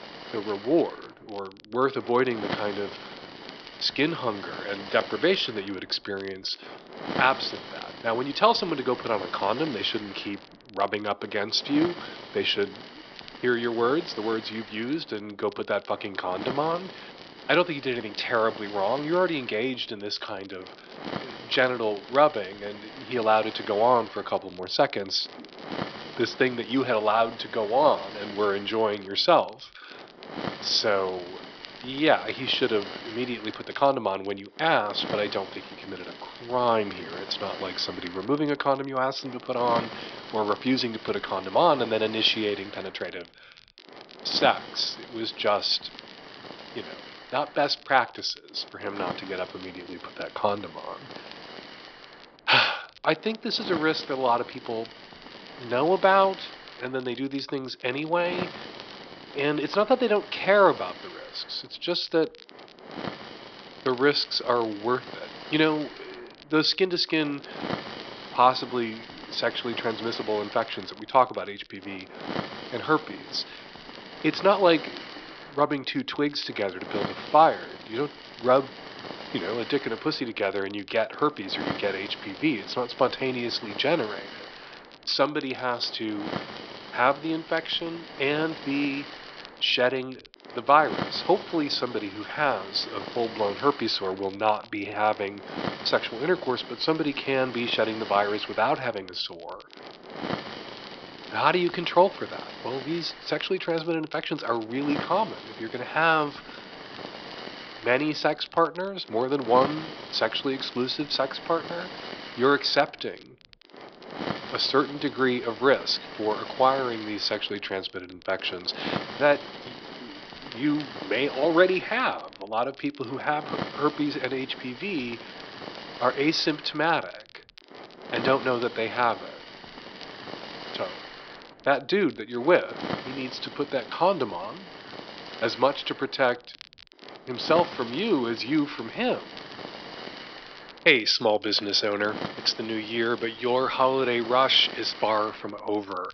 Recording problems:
thin; somewhat; fading below 450 Hz
high frequencies cut off; noticeable; nothing above 5.5 kHz
hiss; noticeable; throughout; 15 dB below the speech
crackle, like an old record; faint; 25 dB below the speech

